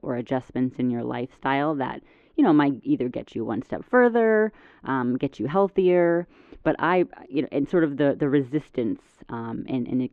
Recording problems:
muffled; very; fading above 3.5 kHz

